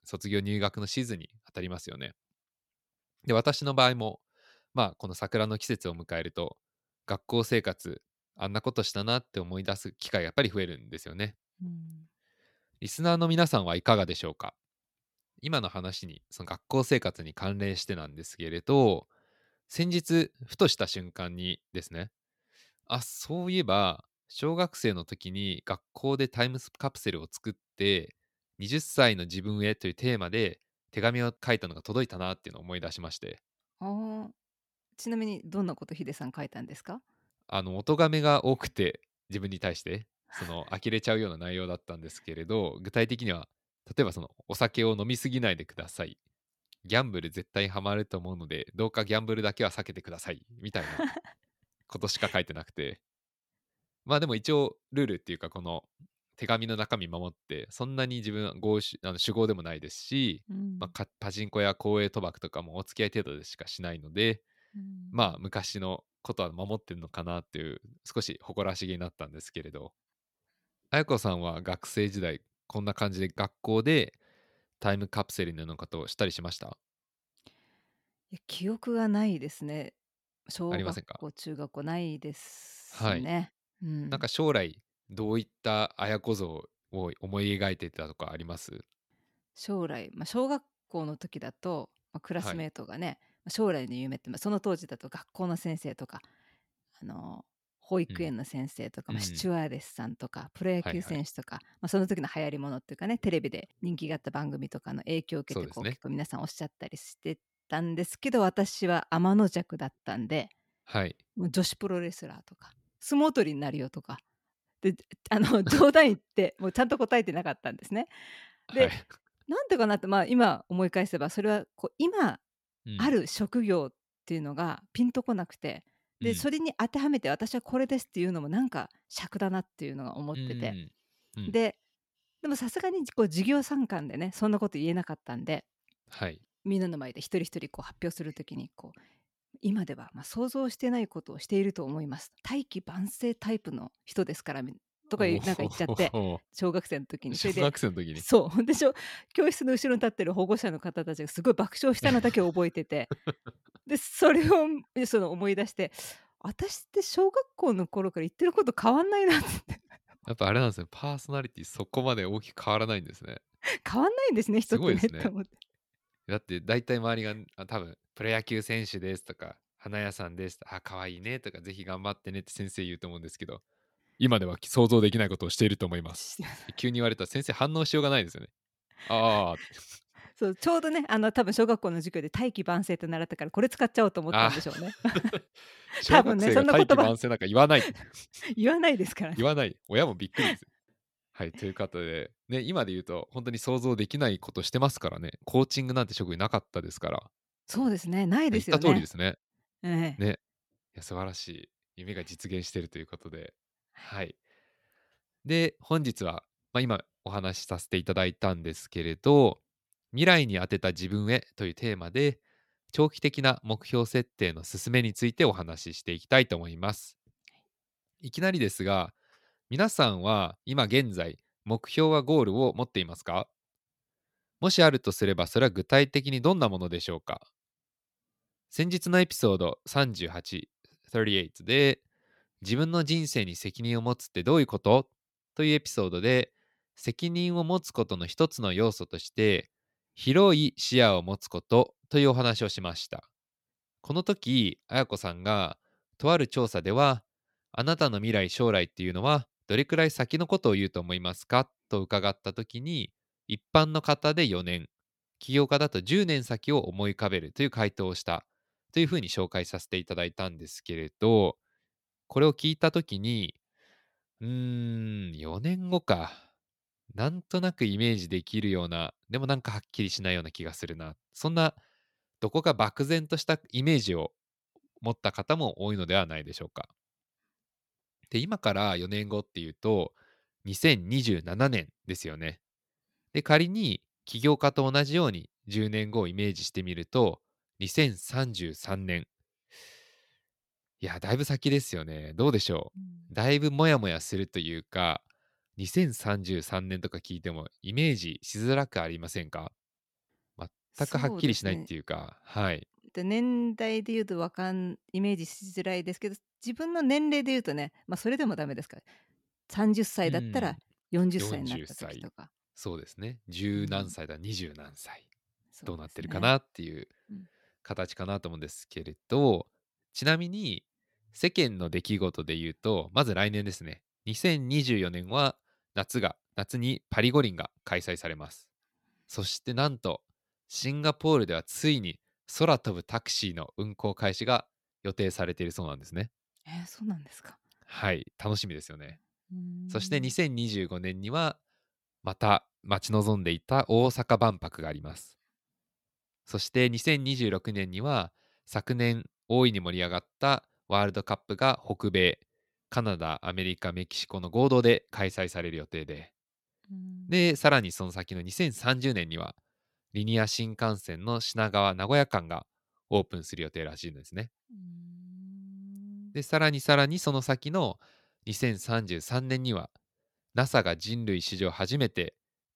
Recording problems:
none

